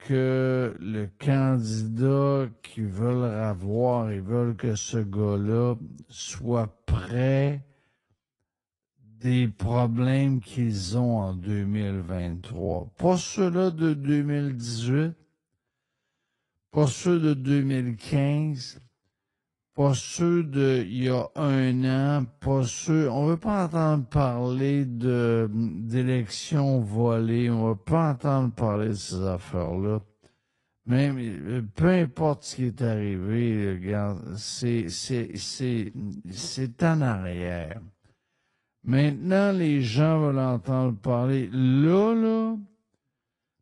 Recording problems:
wrong speed, natural pitch; too slow; 0.5 times normal speed
garbled, watery; slightly; nothing above 10 kHz

